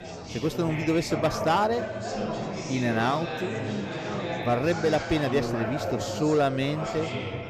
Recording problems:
chatter from many people; loud; throughout; 5 dB below the speech

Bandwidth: 14.5 kHz